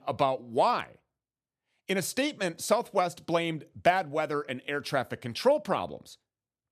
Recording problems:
none

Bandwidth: 14.5 kHz